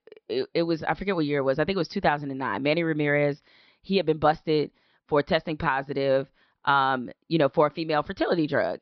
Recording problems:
high frequencies cut off; noticeable; nothing above 5.5 kHz

